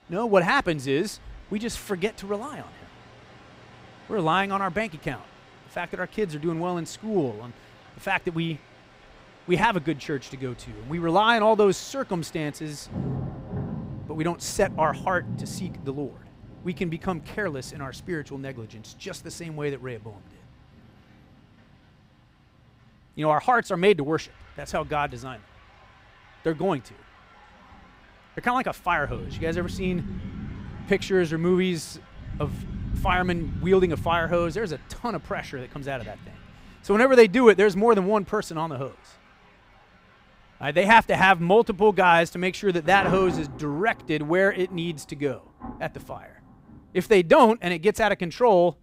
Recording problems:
rain or running water; noticeable; throughout; 15 dB below the speech

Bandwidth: 15.5 kHz